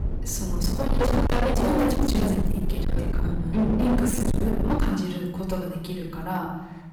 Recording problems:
distortion; heavy; 30% of the sound clipped
off-mic speech; far
room echo; noticeable; dies away in 0.9 s
low rumble; loud; until 5 s; 6 dB below the speech
uneven, jittery; strongly; from 1 to 6 s

